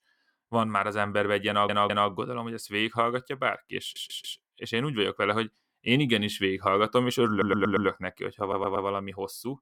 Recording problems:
audio stuttering; 4 times, first at 1.5 s

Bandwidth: 17.5 kHz